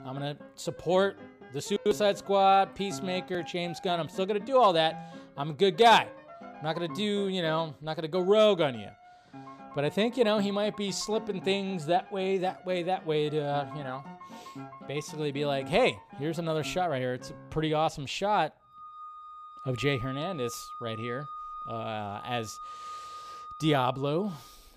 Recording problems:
background music; noticeable; throughout; 15 dB below the speech

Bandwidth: 15 kHz